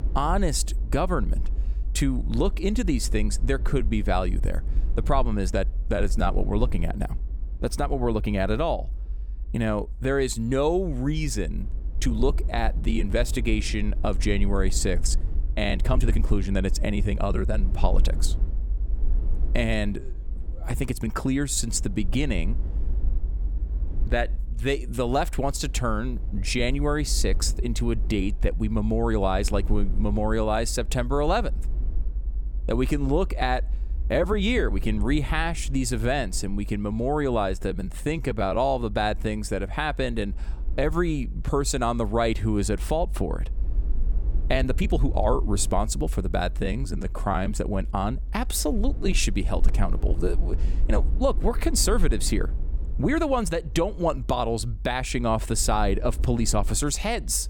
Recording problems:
low rumble; faint; throughout; 20 dB below the speech
uneven, jittery; strongly; from 3.5 to 54 s

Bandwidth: 18 kHz